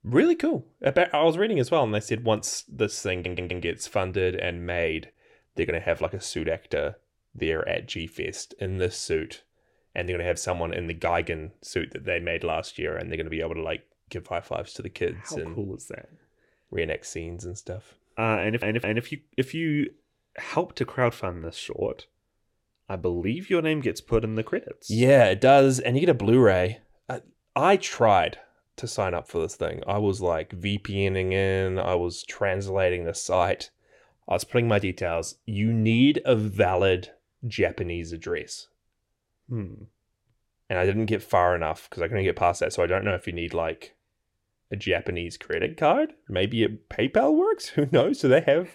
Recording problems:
audio stuttering; at 3 s and at 18 s

